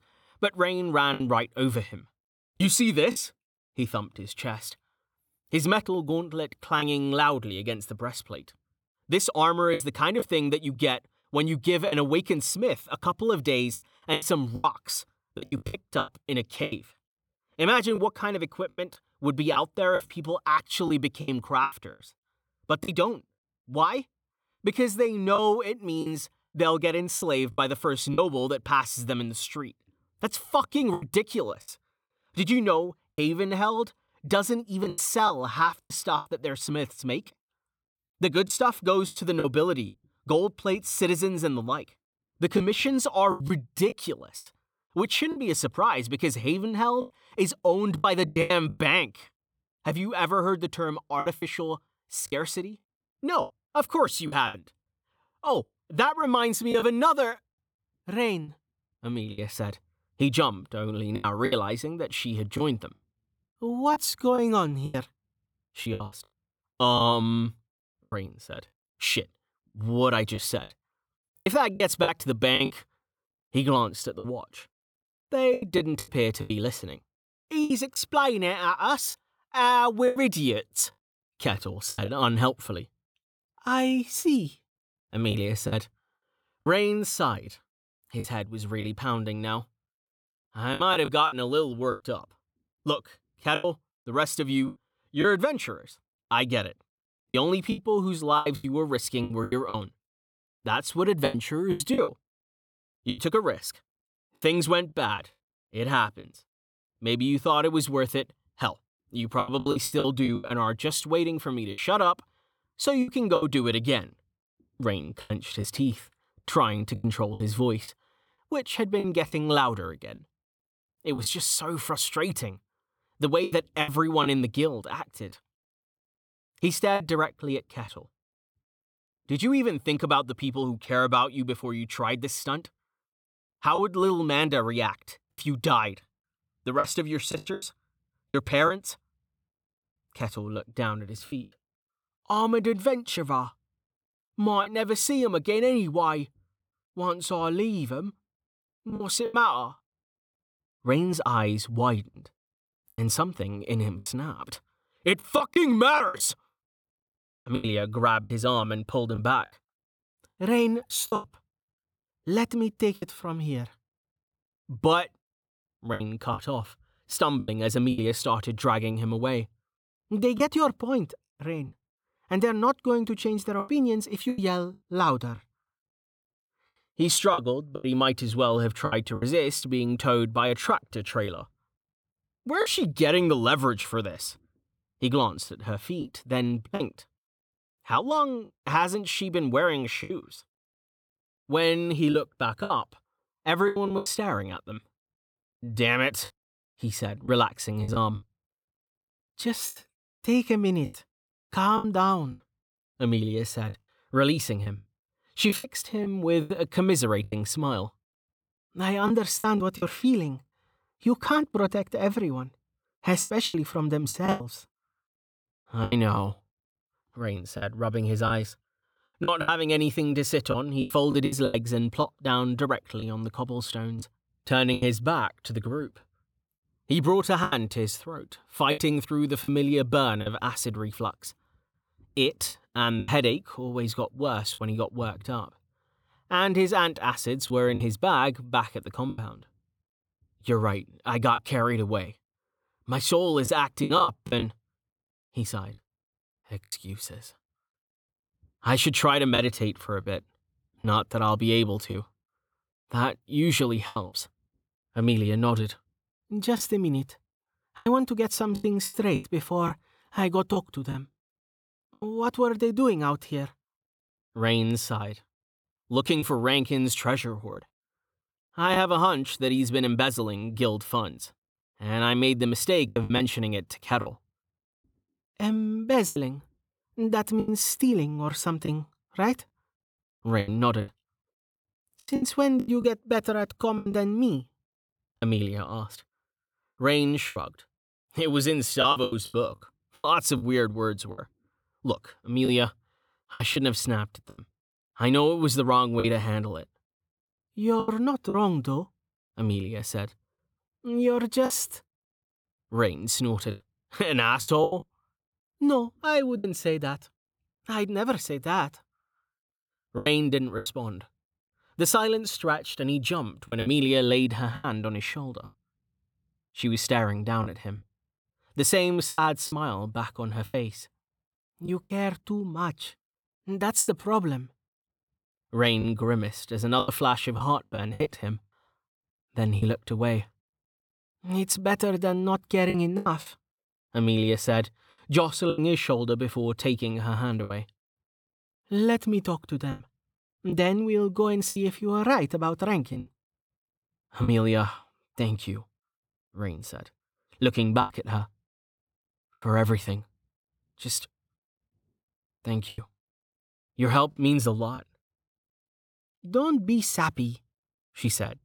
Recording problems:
choppy; very; 7% of the speech affected

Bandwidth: 18.5 kHz